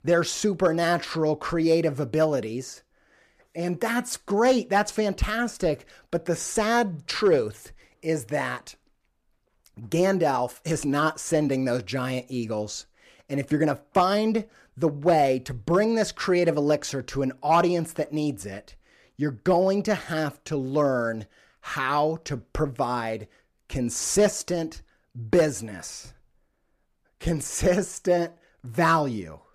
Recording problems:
none

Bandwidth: 15 kHz